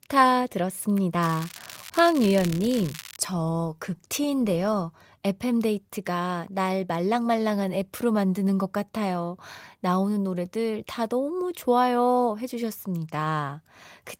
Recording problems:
garbled, watery; slightly; nothing above 16 kHz
crackling; noticeable; from 1 to 3 s; 15 dB below the speech

